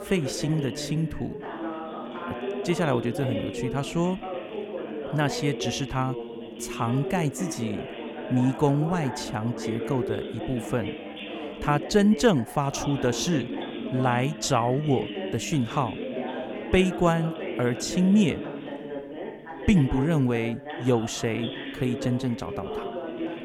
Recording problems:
background chatter; loud; throughout; 2 voices, 8 dB below the speech

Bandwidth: 17.5 kHz